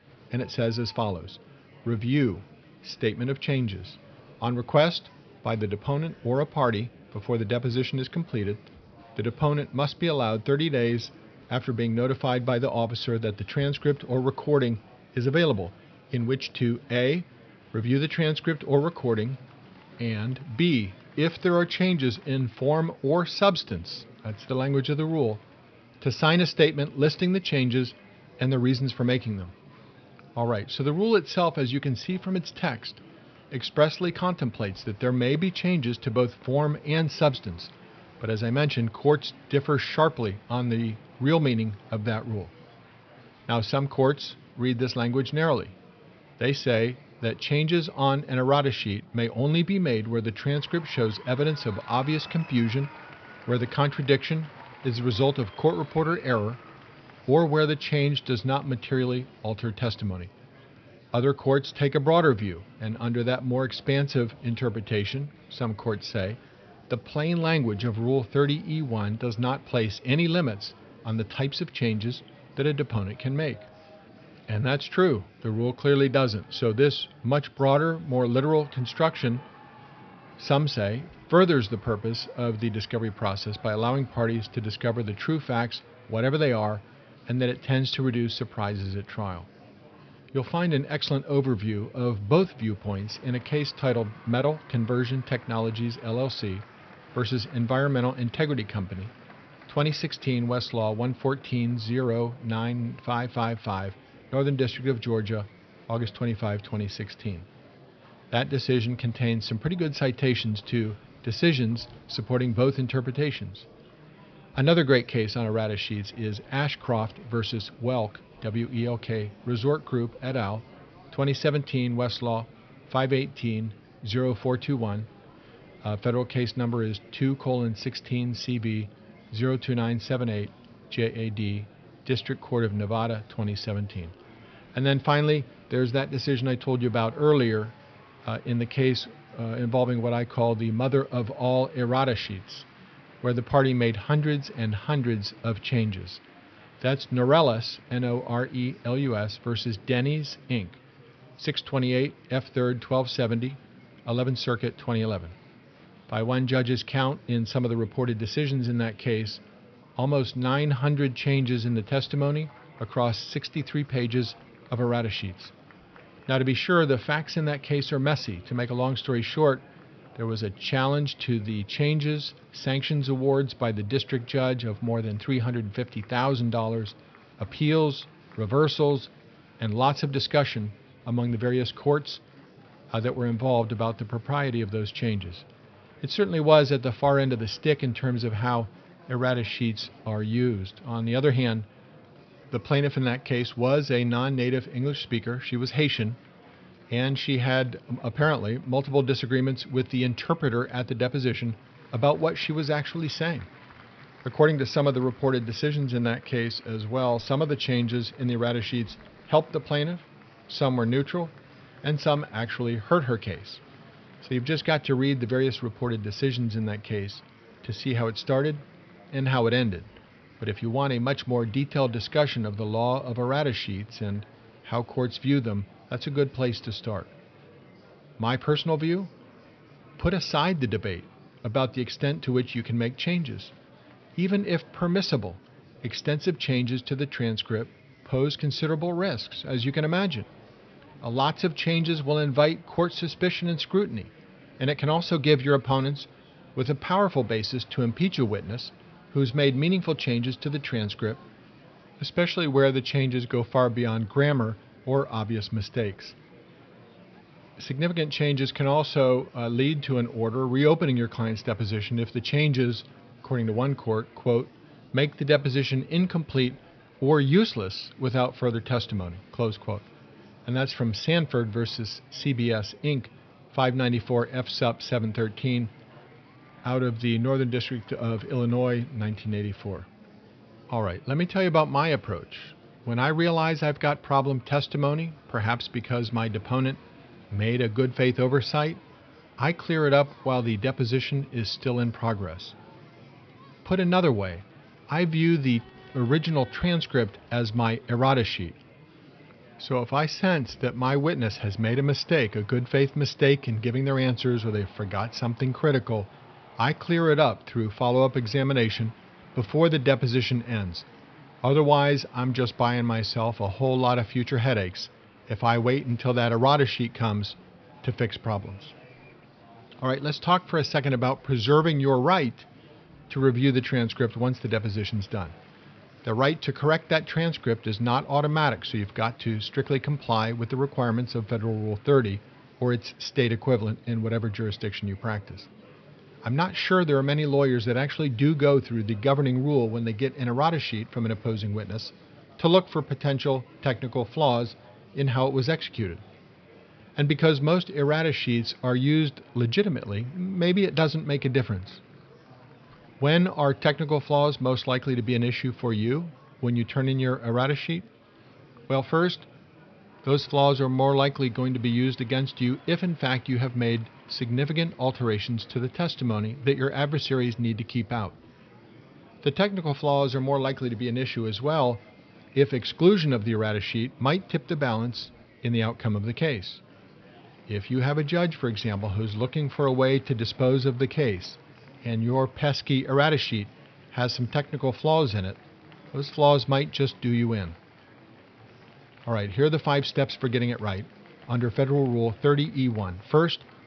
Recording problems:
high frequencies cut off; noticeable; nothing above 5.5 kHz
murmuring crowd; faint; throughout; 25 dB below the speech

